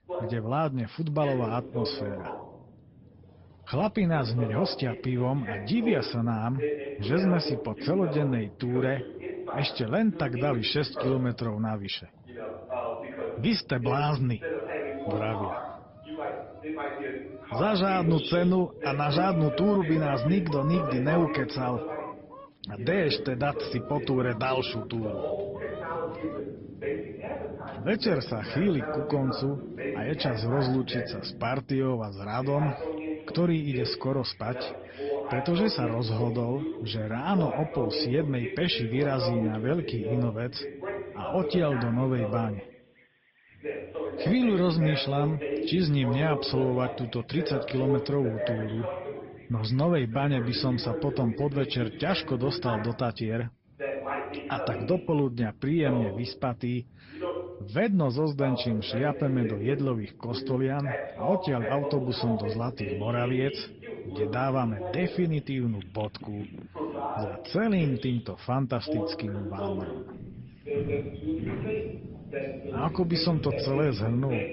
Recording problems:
high frequencies cut off; noticeable; nothing above 5.5 kHz
garbled, watery; slightly
voice in the background; loud; throughout; 7 dB below the speech
animal sounds; noticeable; throughout; 15 dB below the speech
footsteps; noticeable; from 1:10 to 1:14; peak 7 dB below the speech

